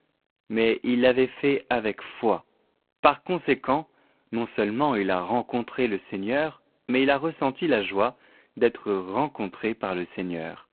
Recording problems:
phone-call audio; poor line; nothing above 4 kHz

